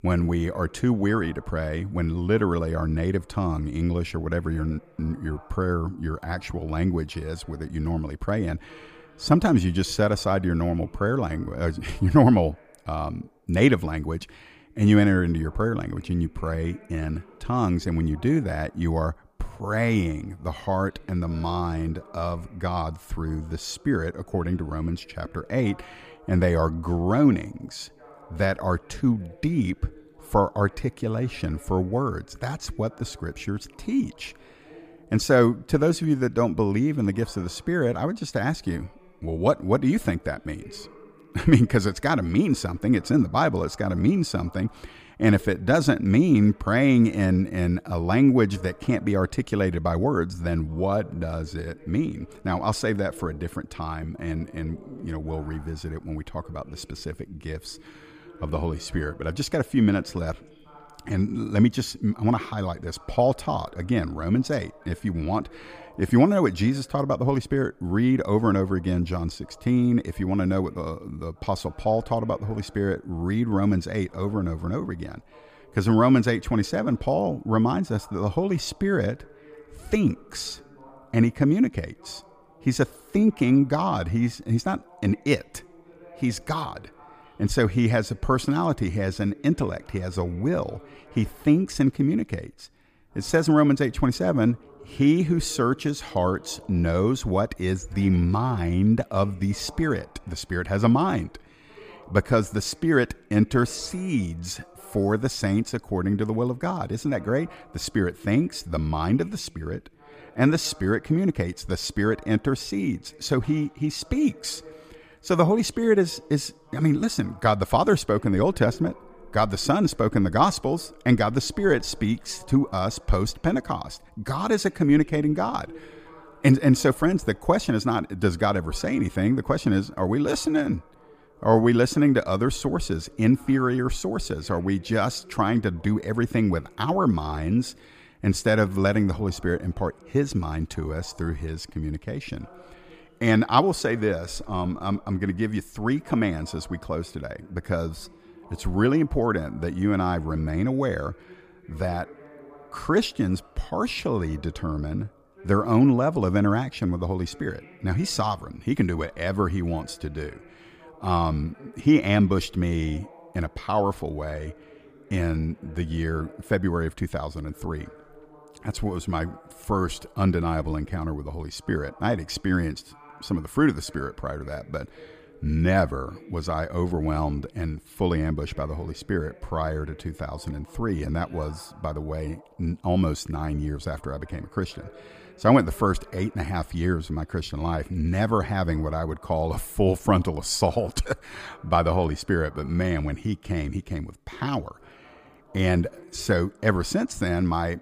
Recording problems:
voice in the background; faint; throughout; 25 dB below the speech

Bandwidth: 15 kHz